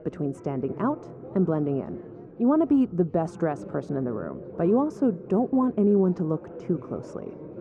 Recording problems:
muffled; very; fading above 1.5 kHz
chatter from many people; noticeable; throughout; 15 dB below the speech

